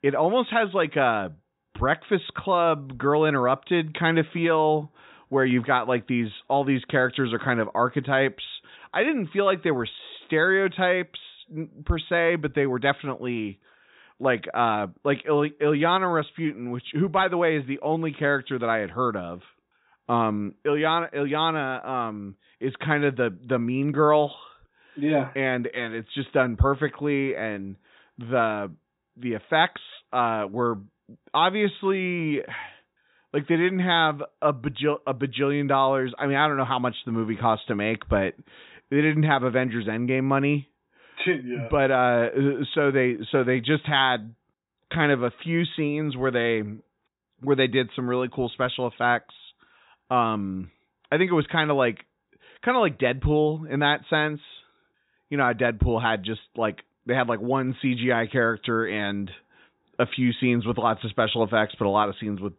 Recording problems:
high frequencies cut off; severe; nothing above 4 kHz

